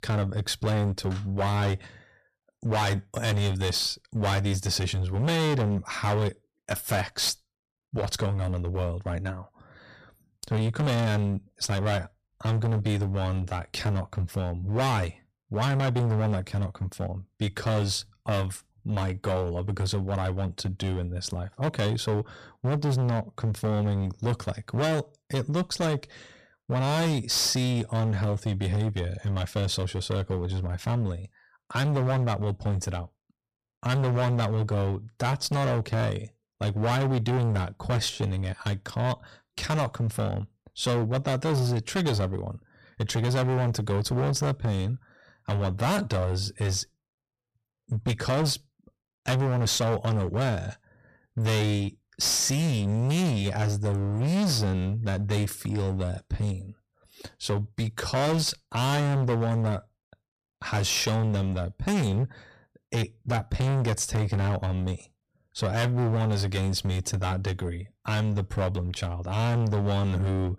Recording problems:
distortion; heavy; 19% of the sound clipped

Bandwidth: 14.5 kHz